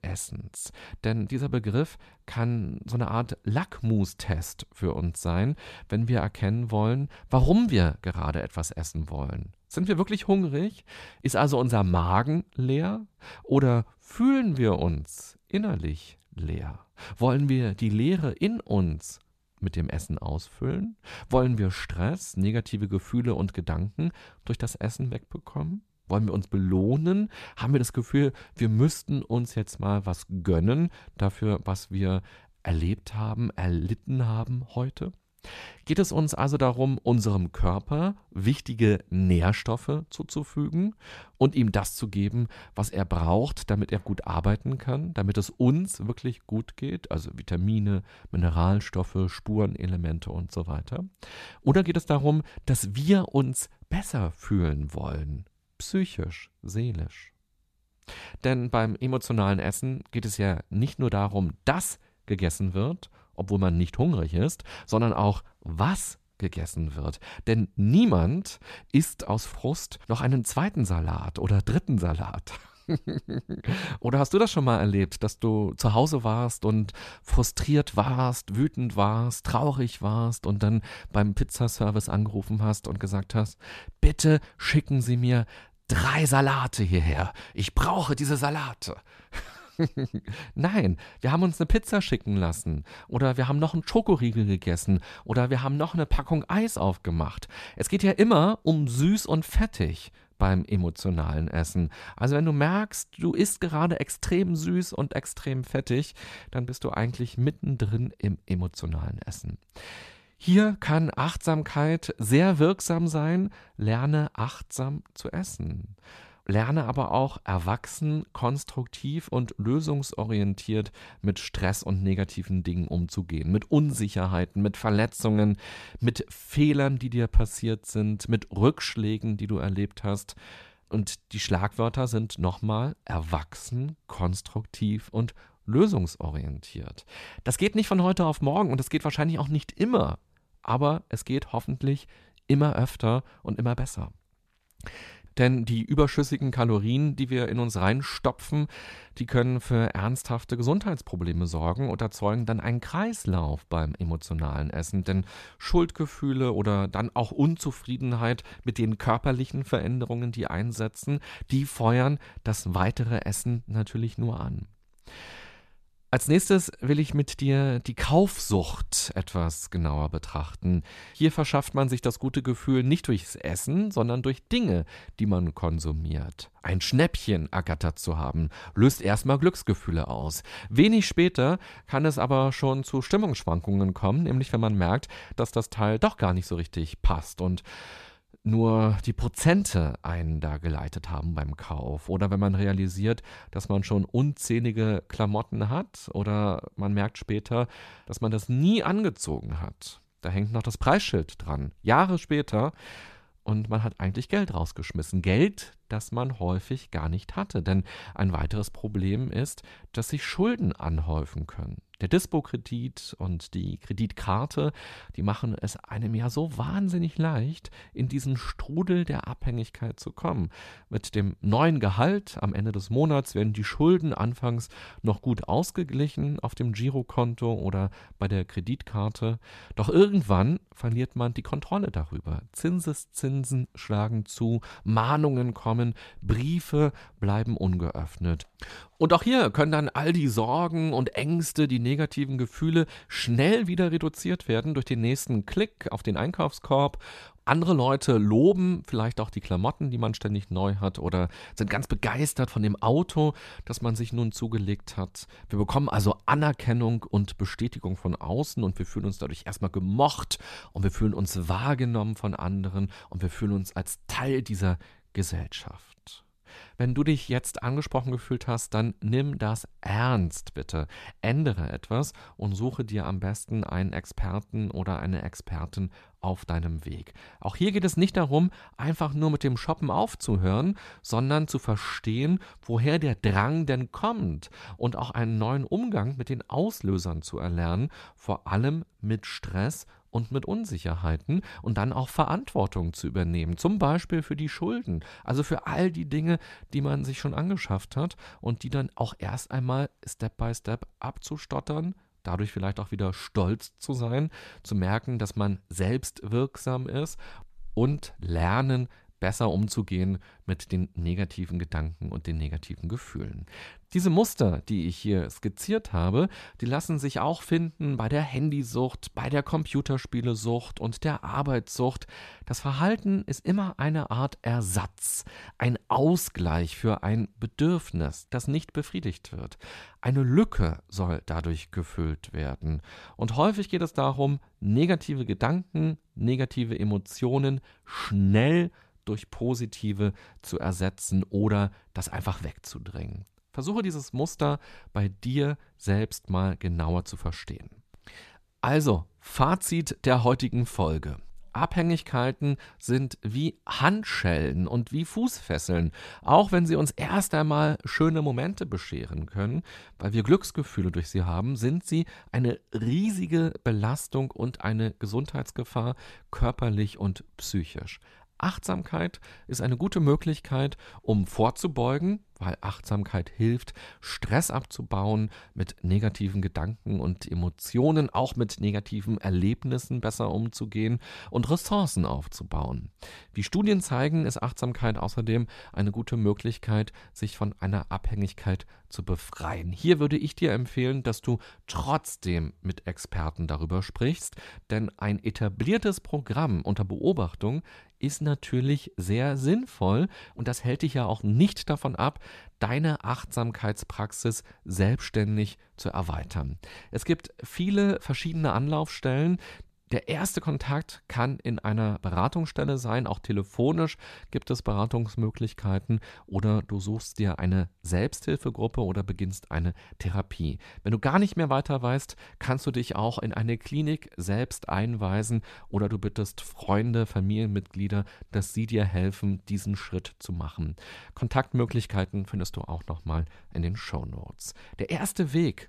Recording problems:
none

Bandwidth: 14 kHz